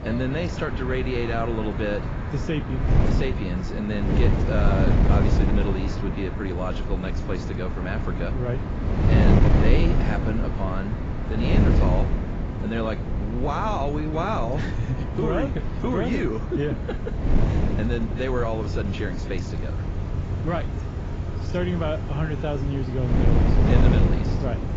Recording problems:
garbled, watery; badly; nothing above 7.5 kHz
wind noise on the microphone; heavy; 3 dB below the speech
traffic noise; loud; throughout; 7 dB below the speech

